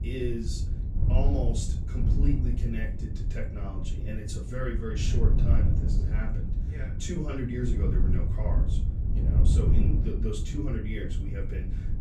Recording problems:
off-mic speech; far
room echo; slight; dies away in 0.3 s
wind noise on the microphone; heavy; 4 dB below the speech
low rumble; faint; throughout; 20 dB below the speech

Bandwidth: 14.5 kHz